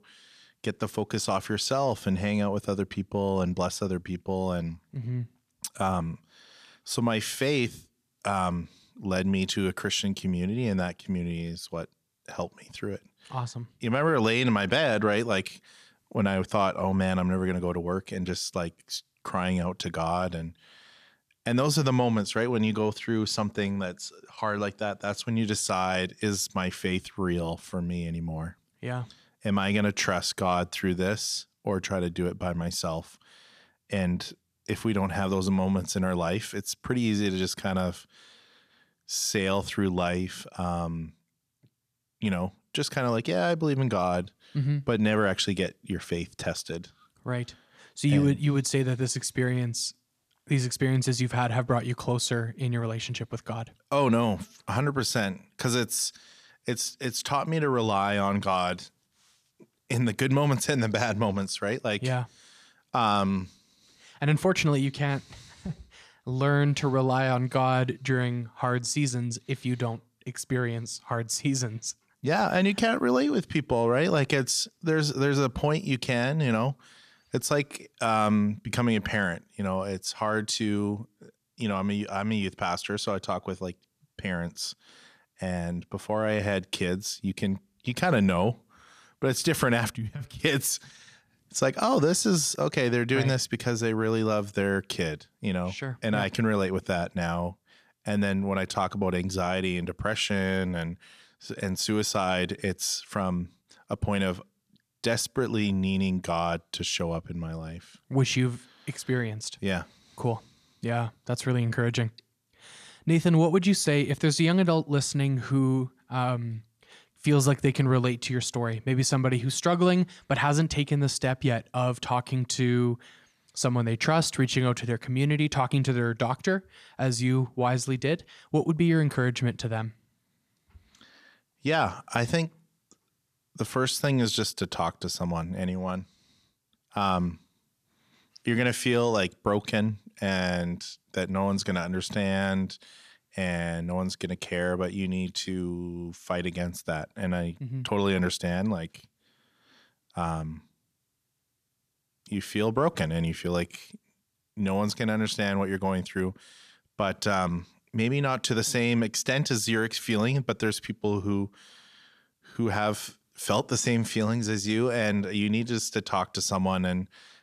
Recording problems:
none

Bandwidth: 14.5 kHz